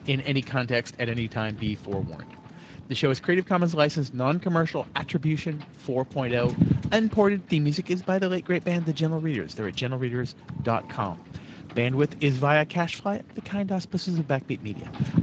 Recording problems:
garbled, watery; slightly; nothing above 7.5 kHz
wind noise on the microphone; occasional gusts; 15 dB below the speech

